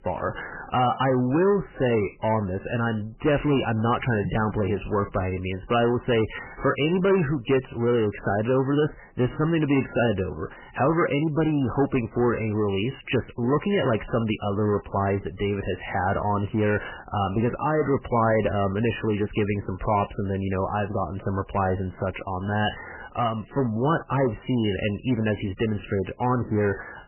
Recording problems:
garbled, watery; badly; nothing above 3 kHz
distortion; slight; 10 dB below the speech

